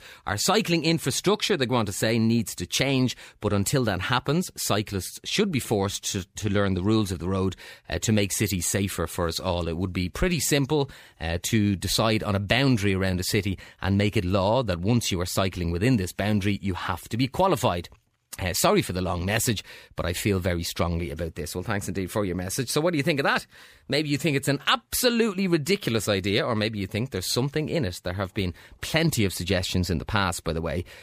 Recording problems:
none

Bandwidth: 15 kHz